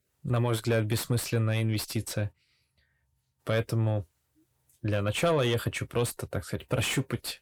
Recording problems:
distortion; slight; 10 dB below the speech

